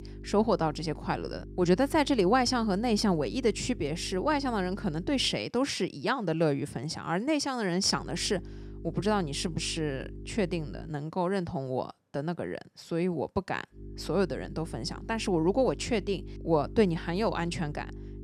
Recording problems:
electrical hum; faint; until 5.5 s, from 8 to 11 s and from 14 s on; 50 Hz, 20 dB below the speech

